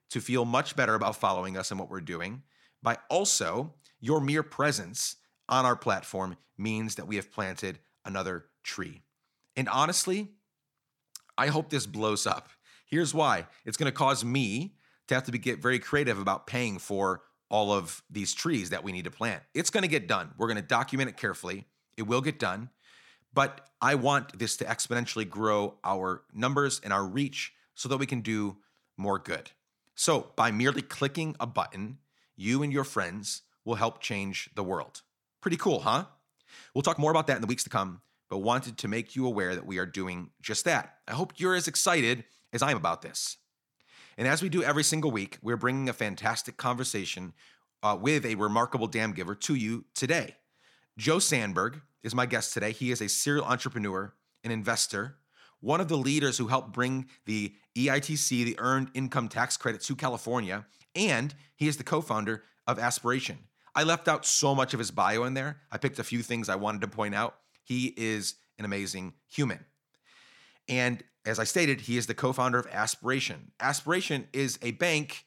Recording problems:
uneven, jittery; strongly; from 25 to 56 s

